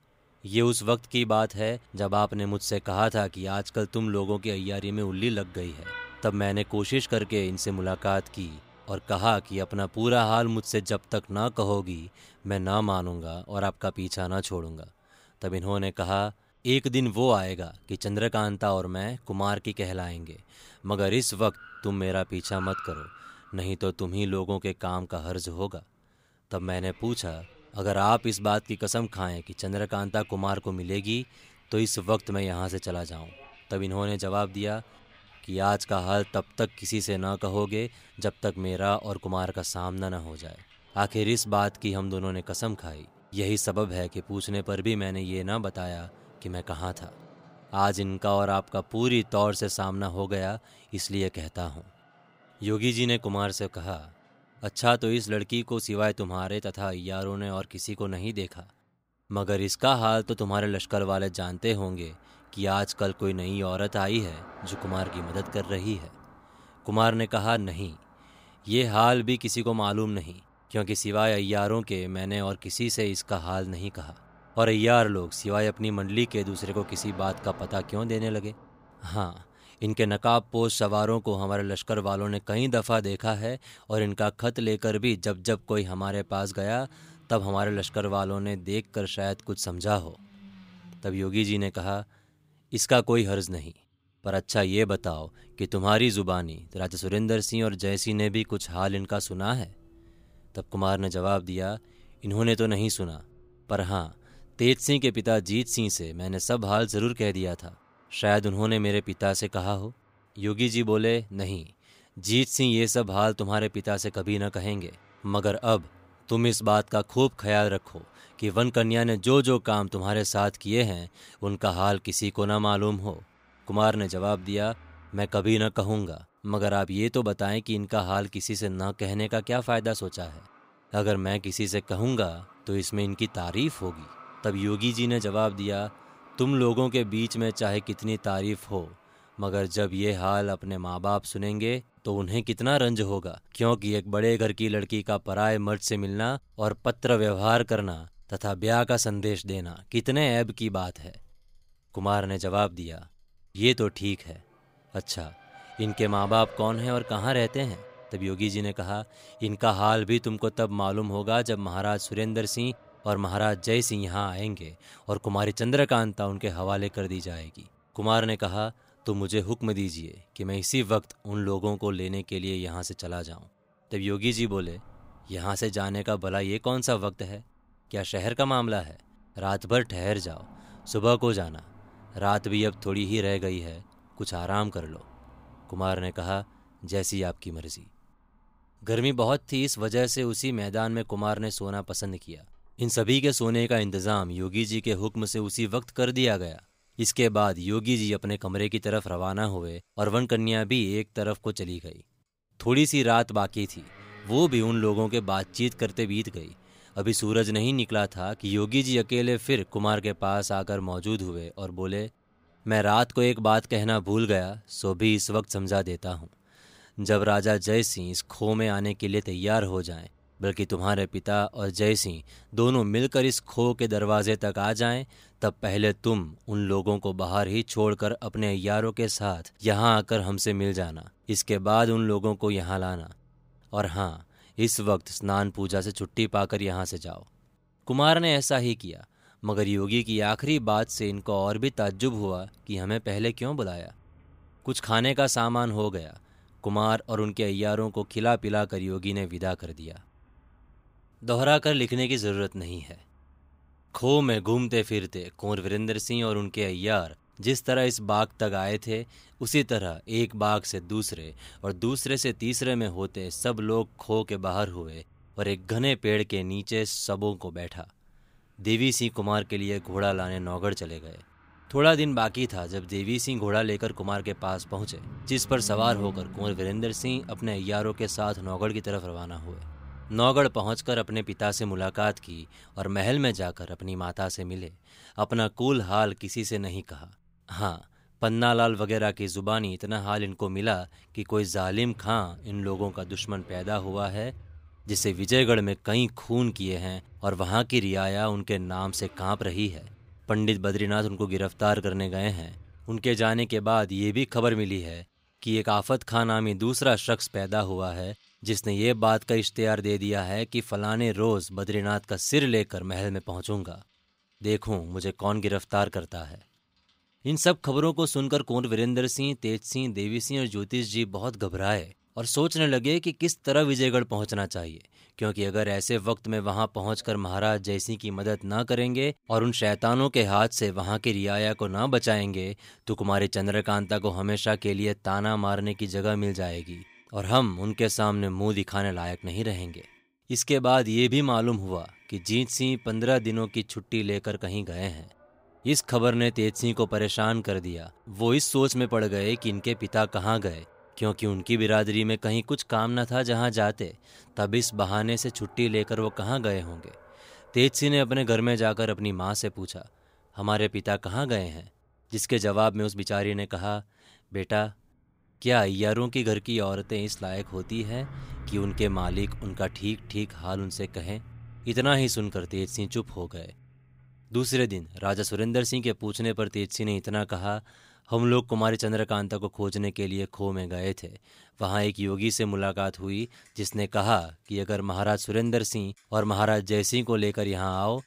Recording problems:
traffic noise; faint; throughout; 25 dB below the speech

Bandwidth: 15.5 kHz